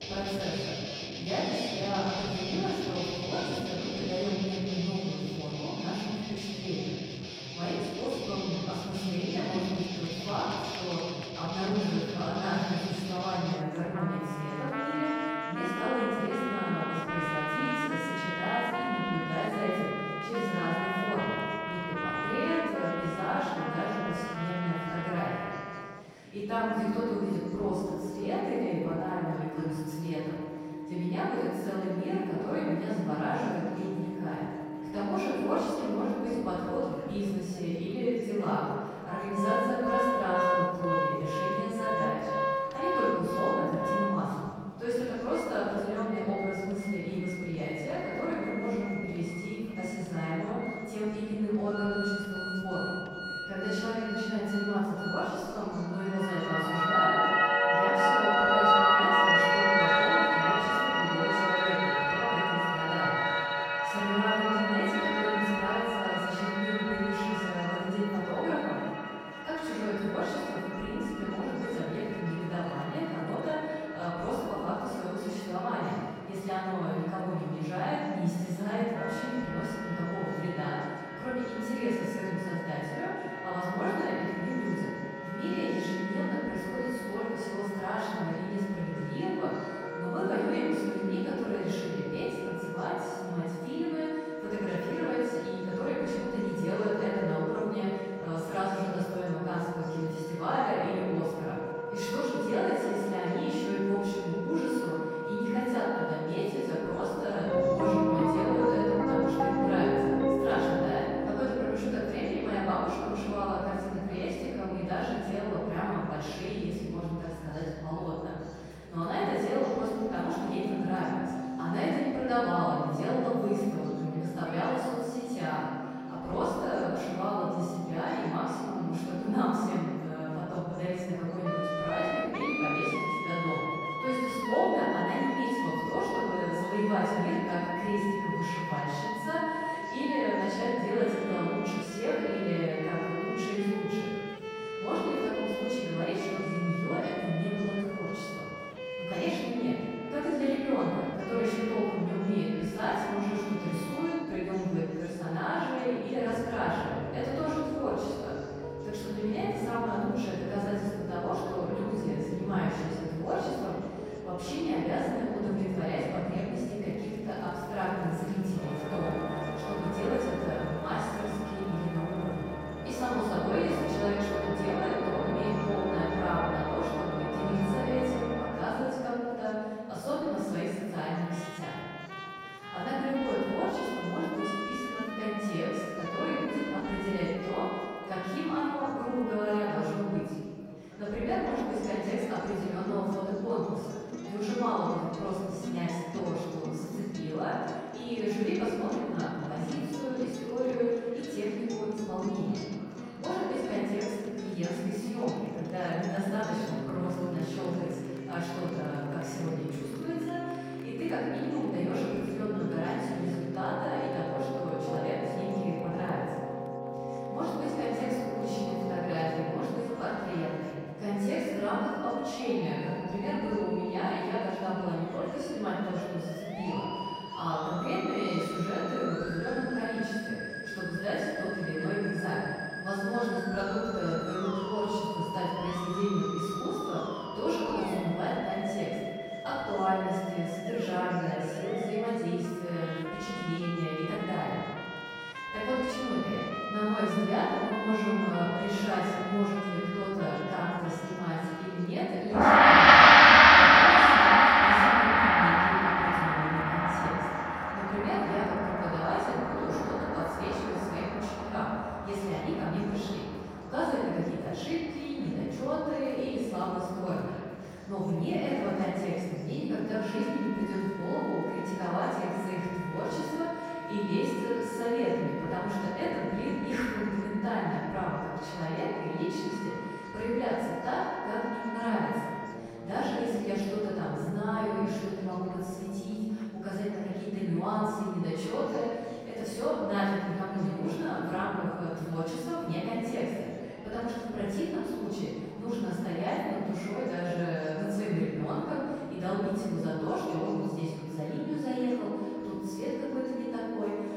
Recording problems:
room echo; strong; dies away in 1.8 s
off-mic speech; far
background music; very loud; throughout; 2 dB above the speech
chatter from many people; faint; throughout; 20 dB below the speech

